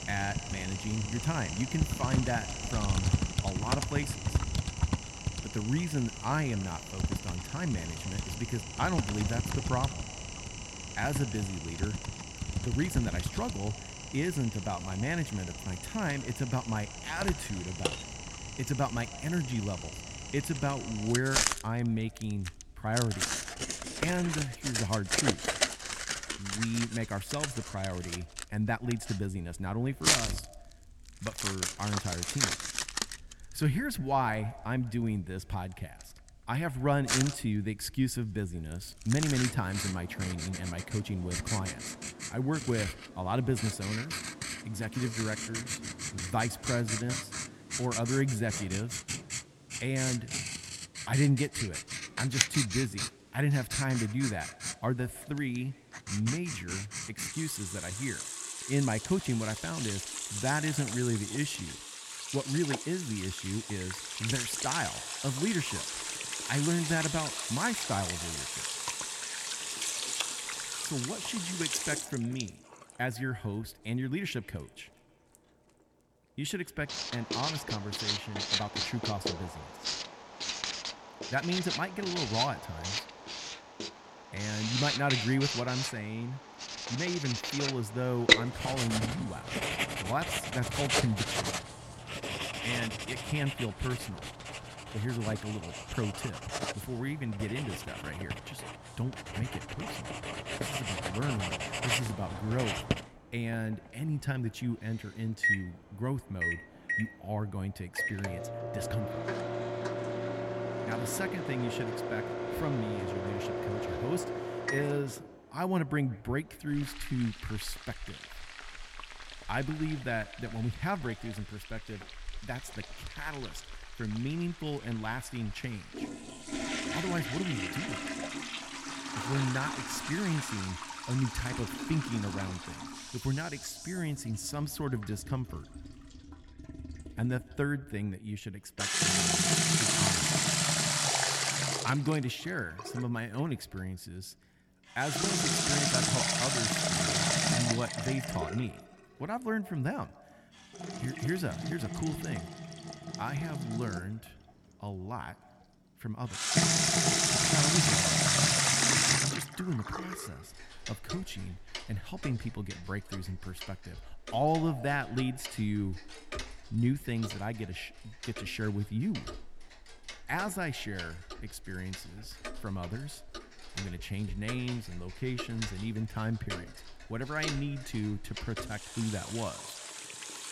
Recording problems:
echo of what is said; faint; throughout; 150 ms later, 25 dB below the speech
household noises; very loud; throughout; 2 dB above the speech

